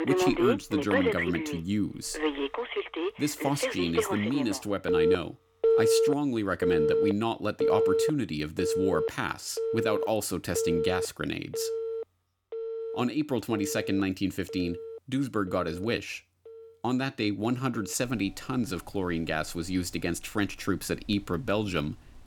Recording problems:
alarms or sirens; very loud; throughout; 1 dB above the speech

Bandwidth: 18 kHz